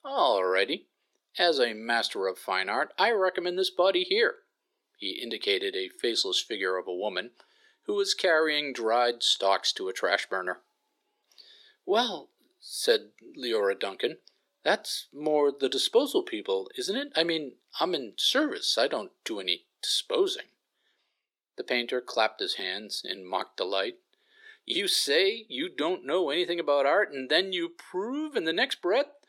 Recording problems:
thin; somewhat; fading below 350 Hz

